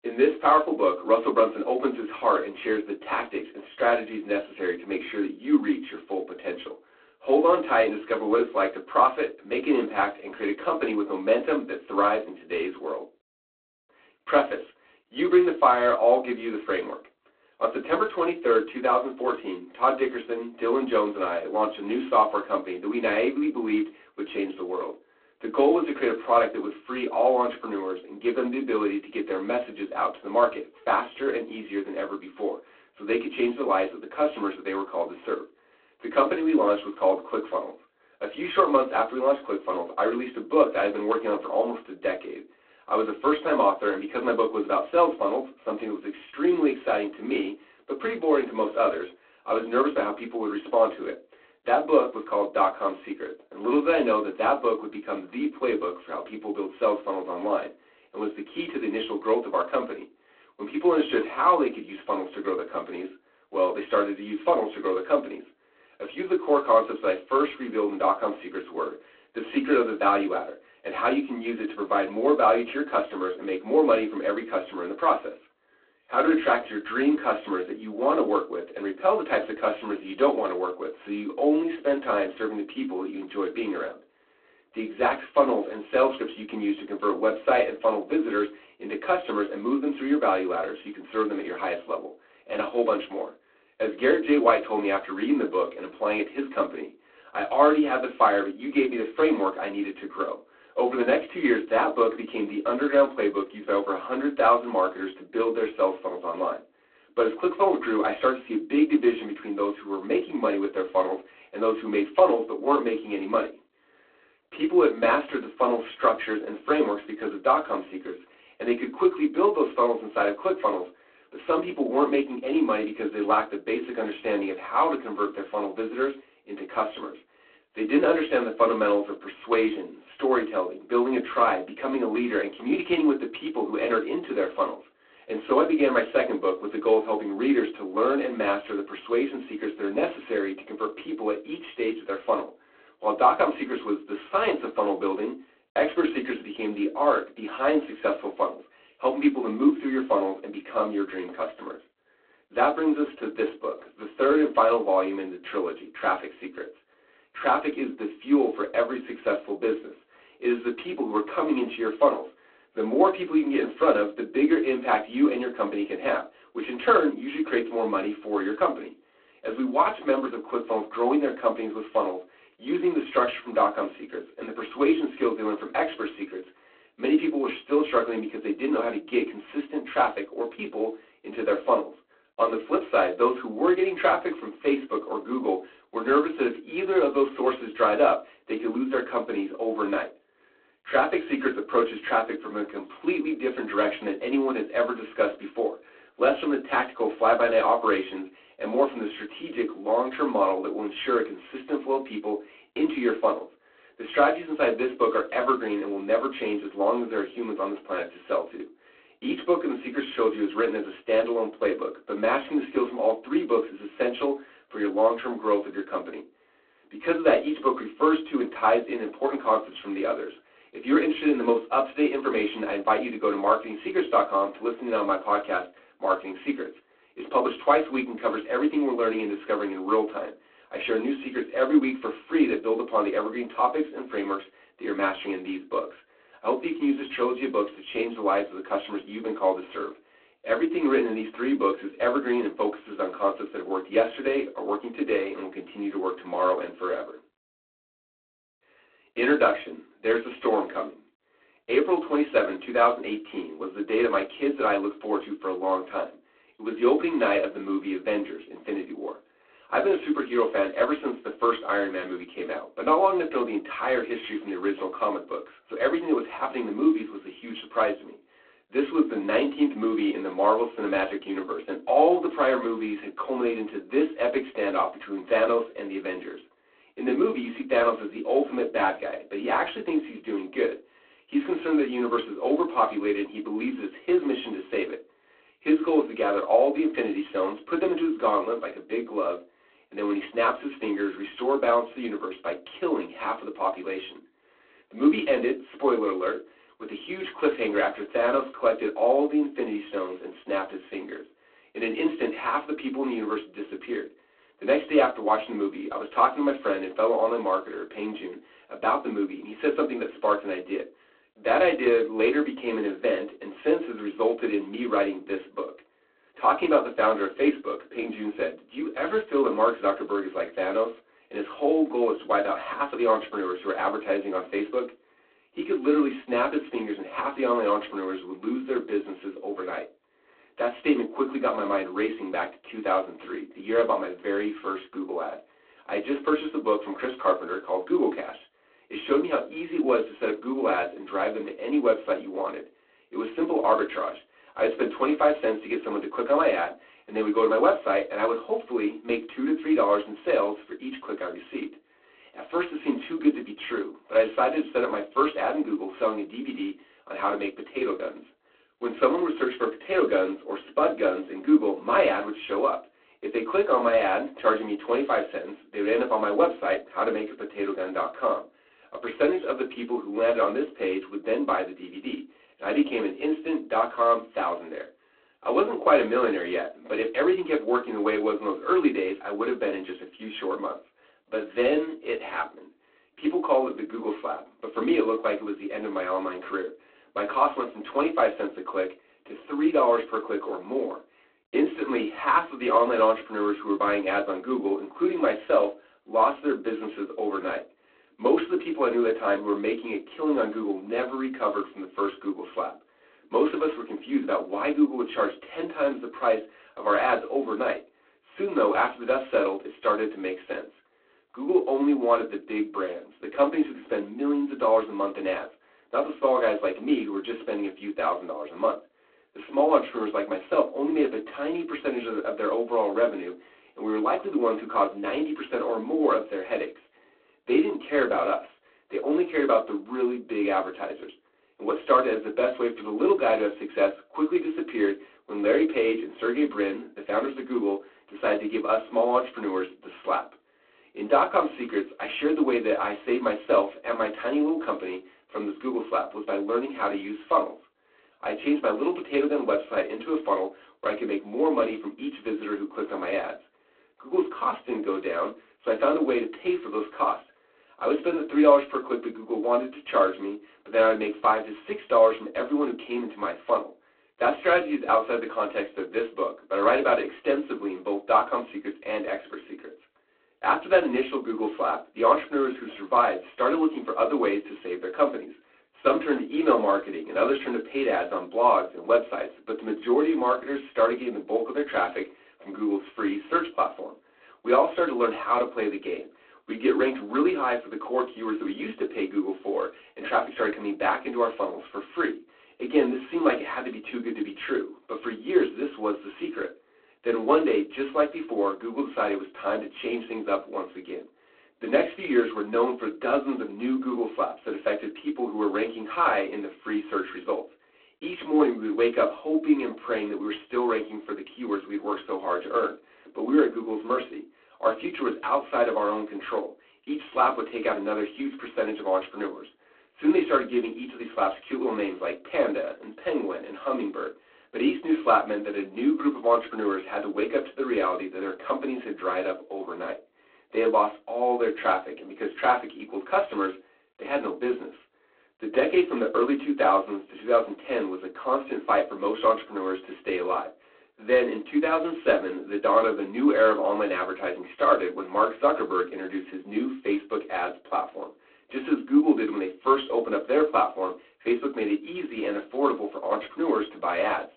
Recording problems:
phone-call audio; poor line; nothing above 4 kHz
off-mic speech; far
room echo; very slight; dies away in 0.2 s

